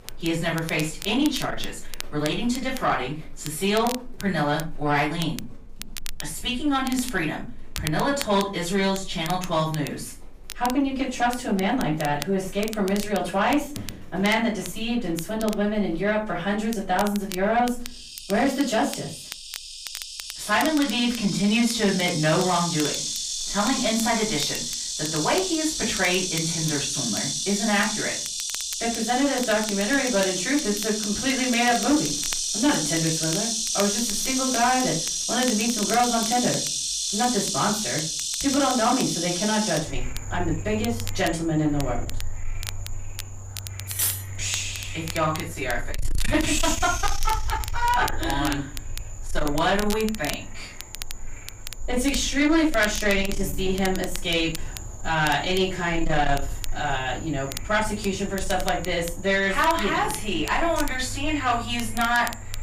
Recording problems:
off-mic speech; far
room echo; slight; dies away in 0.3 s
distortion; slight; 10 dB below the speech
animal sounds; loud; throughout; 4 dB below the speech
crackle, like an old record; noticeable; 15 dB below the speech
clattering dishes; loud; at 44 s; peak 1 dB above the speech

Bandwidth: 15 kHz